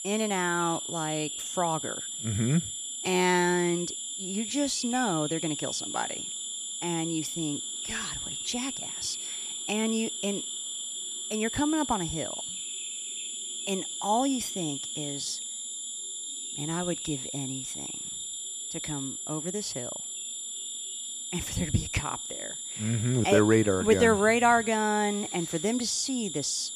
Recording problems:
high-pitched whine; loud; throughout; 7 kHz, 6 dB below the speech
animal sounds; noticeable; throughout; 10 dB below the speech

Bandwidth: 14.5 kHz